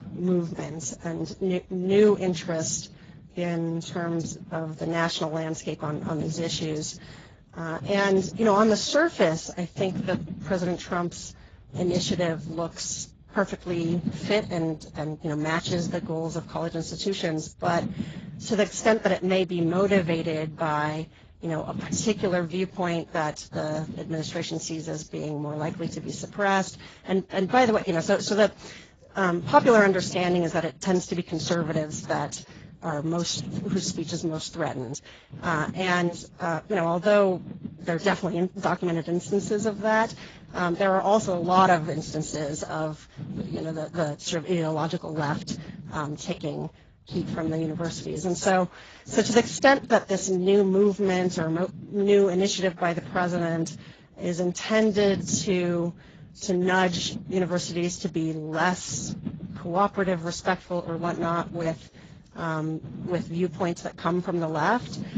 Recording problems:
garbled, watery; badly; nothing above 7.5 kHz
low rumble; noticeable; throughout; 20 dB below the speech

